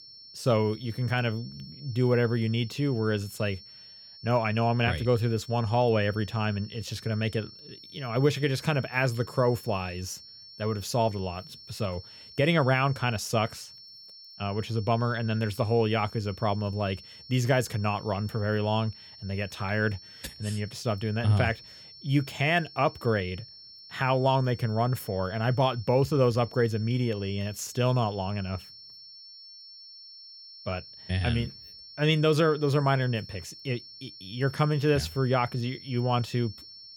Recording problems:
high-pitched whine; noticeable; throughout; 5.5 kHz, 20 dB below the speech

